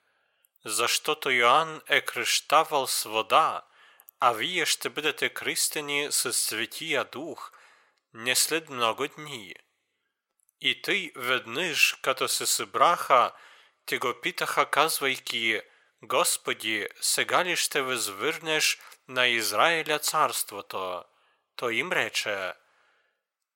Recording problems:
thin; very; fading below 750 Hz

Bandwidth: 16.5 kHz